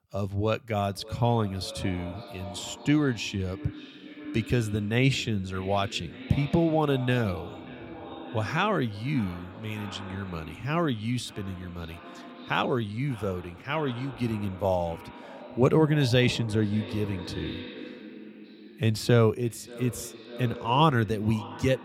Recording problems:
echo of what is said; noticeable; throughout; 580 ms later, 15 dB below the speech

